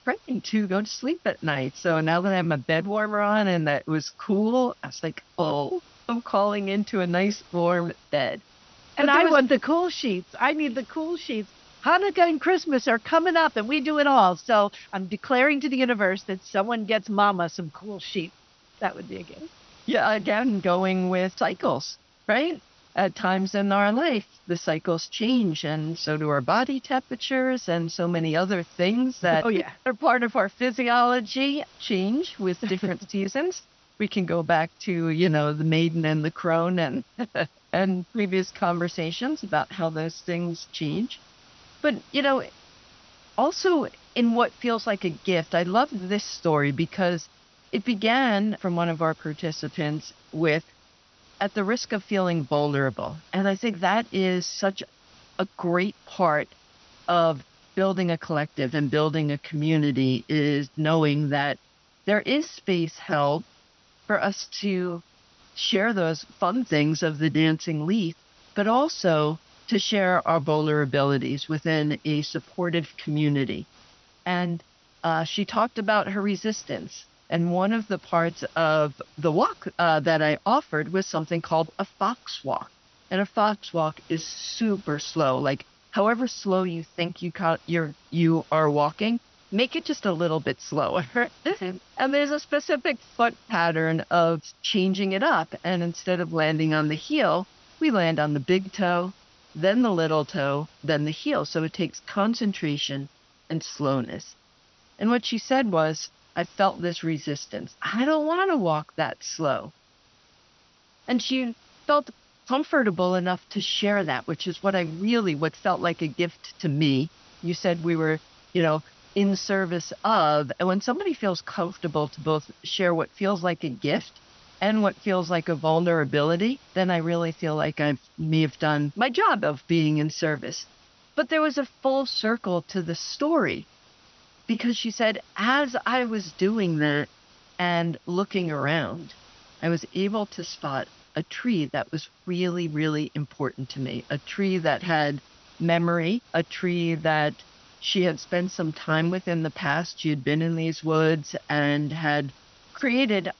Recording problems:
high frequencies cut off; noticeable; nothing above 6 kHz
hiss; faint; throughout; 30 dB below the speech

